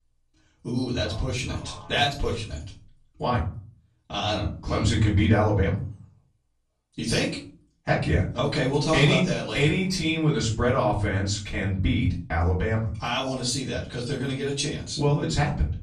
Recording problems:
off-mic speech; far
room echo; slight; dies away in 0.4 s

